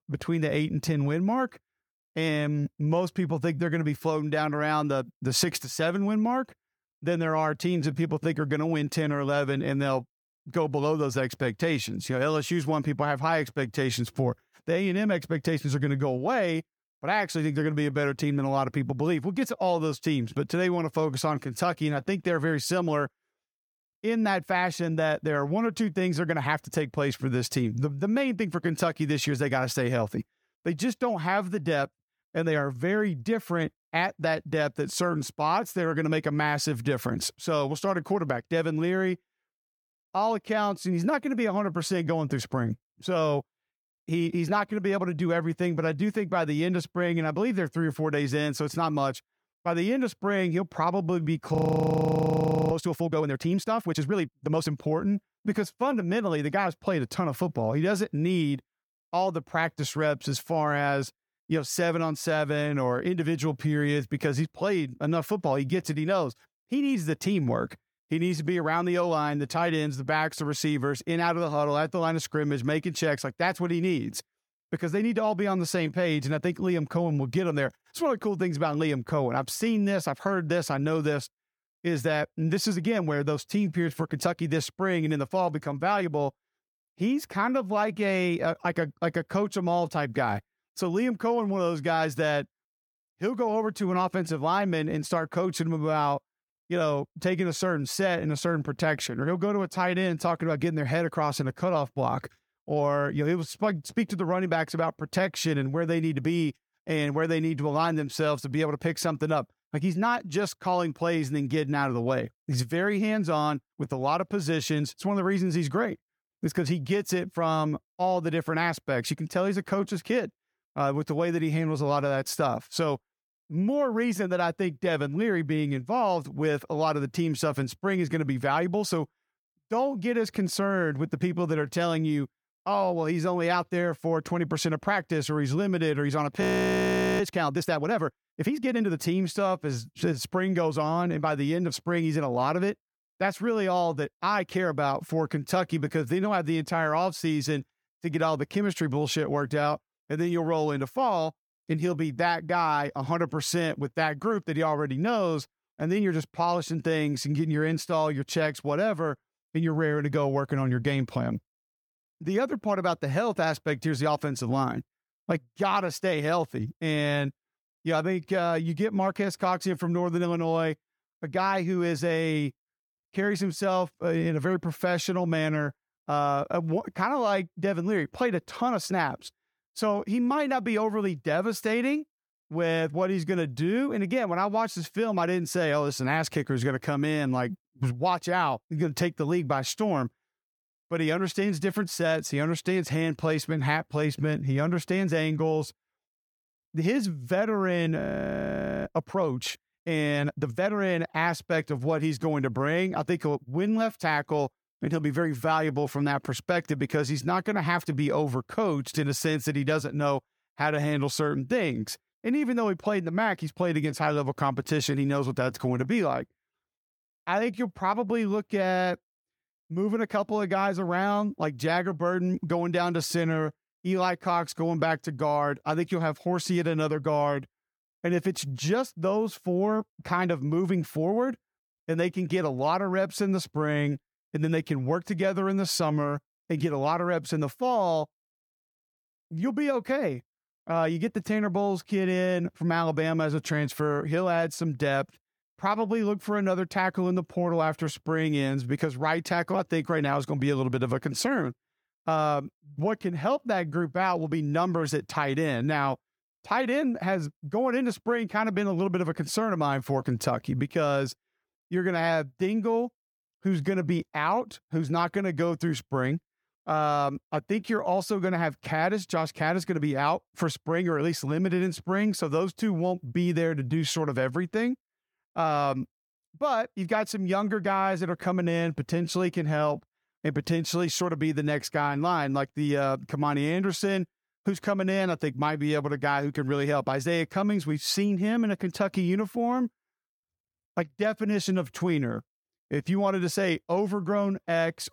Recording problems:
audio freezing; at 52 s for 1 s, at 2:16 for 1 s and at 3:18 for 1 s

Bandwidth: 18.5 kHz